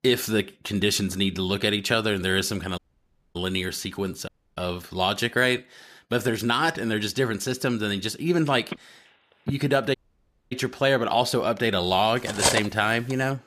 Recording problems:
audio cutting out; at 3 s for 0.5 s, at 4.5 s and at 10 s for 0.5 s
phone ringing; faint; at 8.5 s; peak 10 dB below the speech
clattering dishes; loud; at 12 s; peak 2 dB above the speech

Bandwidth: 14.5 kHz